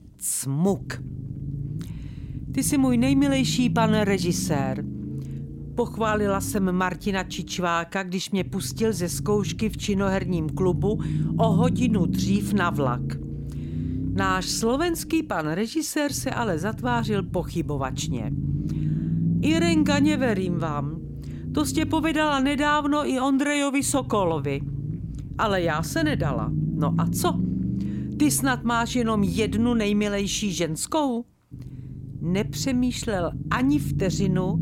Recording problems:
low rumble; noticeable; throughout; 10 dB below the speech

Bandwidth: 16.5 kHz